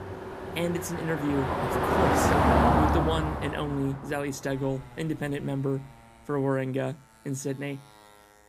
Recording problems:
traffic noise; very loud; throughout; 5 dB above the speech

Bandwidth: 15 kHz